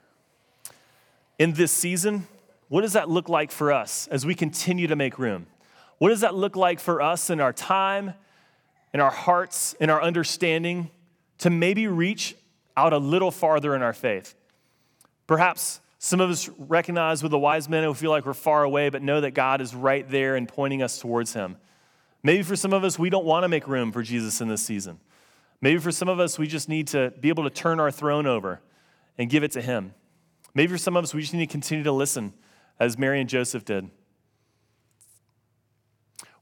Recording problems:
none

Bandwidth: 18.5 kHz